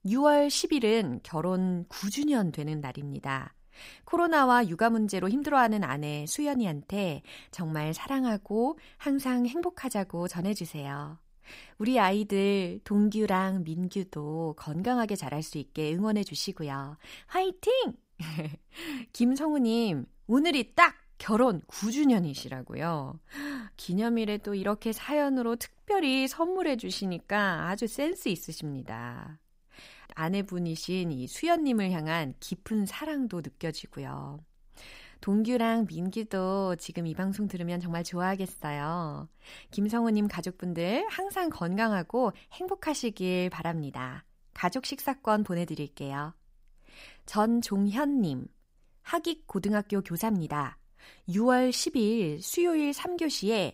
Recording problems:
none

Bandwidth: 15.5 kHz